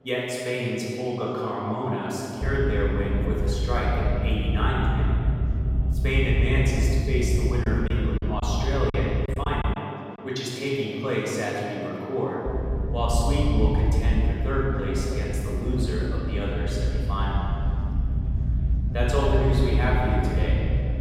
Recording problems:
room echo; strong; dies away in 2.3 s
off-mic speech; far
electrical hum; noticeable; throughout; 50 Hz, 20 dB below the speech
low rumble; noticeable; from 2.5 to 9.5 s and from 12 s on; 10 dB below the speech
murmuring crowd; faint; throughout; 30 dB below the speech
choppy; very; from 7.5 to 10 s; 10% of the speech affected

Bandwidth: 16.5 kHz